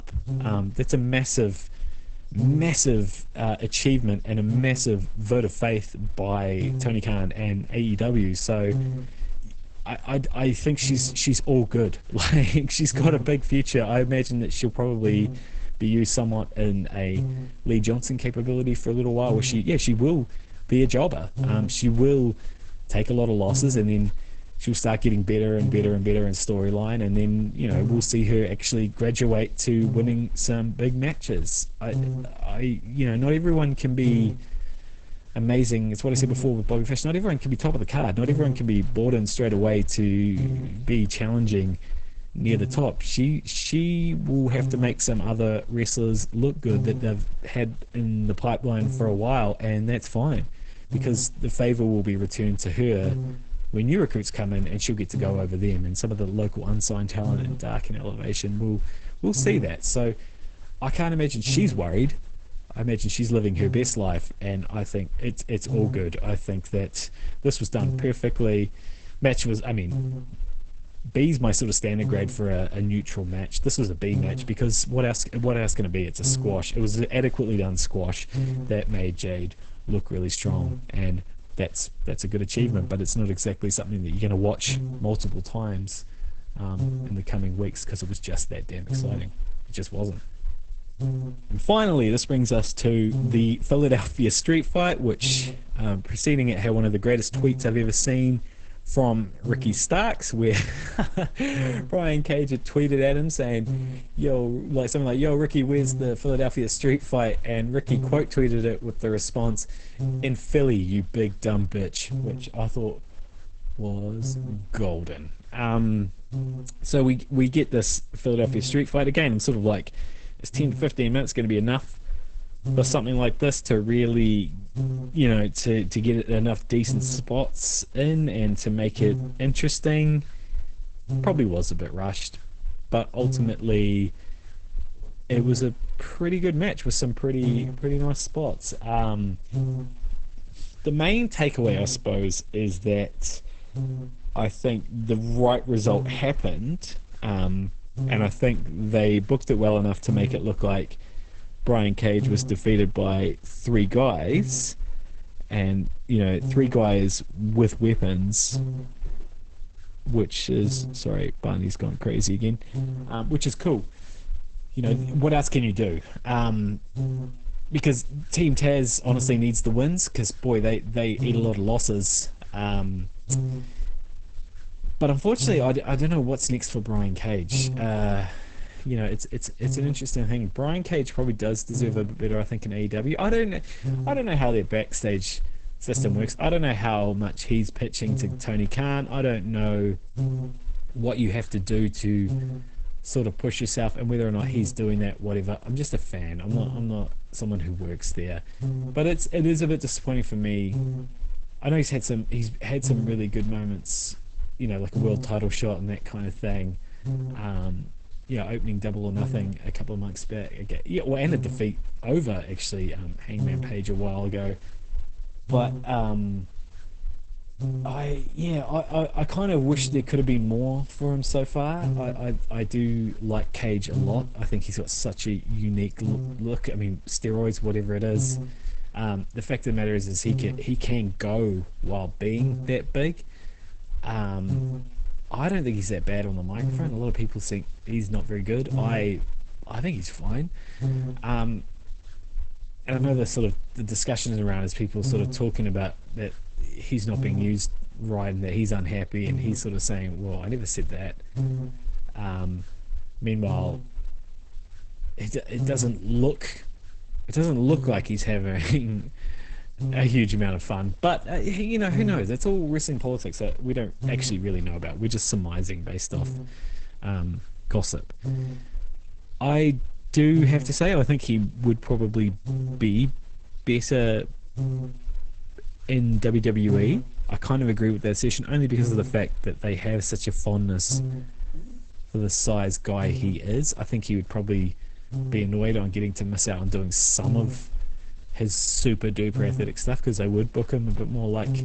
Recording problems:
garbled, watery; badly; nothing above 8 kHz
electrical hum; noticeable; throughout; 60 Hz, 10 dB below the speech

